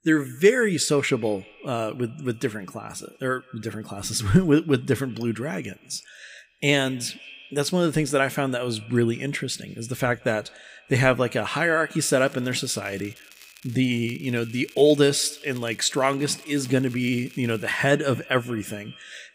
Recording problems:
echo of what is said; faint; throughout; 180 ms later, 25 dB below the speech
crackling; faint; from 12 to 18 s; 25 dB below the speech

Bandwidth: 15.5 kHz